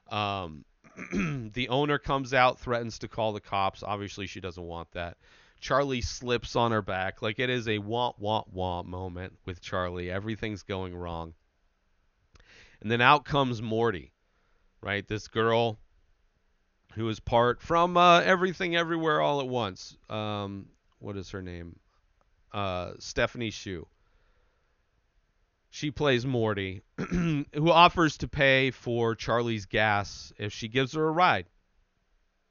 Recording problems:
high frequencies cut off; noticeable; nothing above 6.5 kHz

